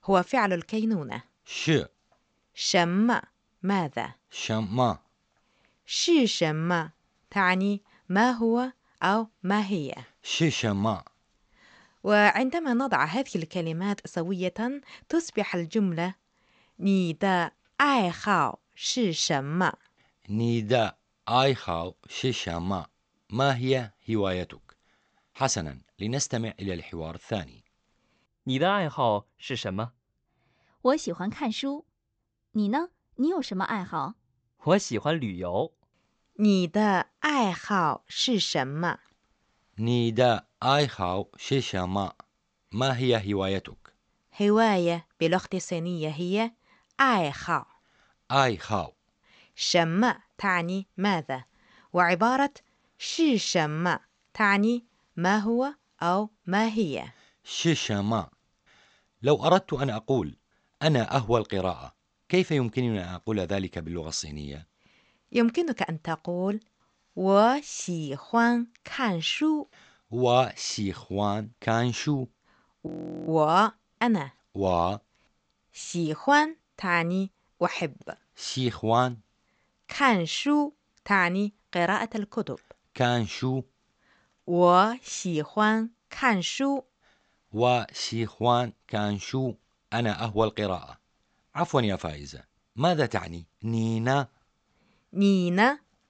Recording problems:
high frequencies cut off; noticeable; nothing above 8 kHz
audio freezing; at 1:13

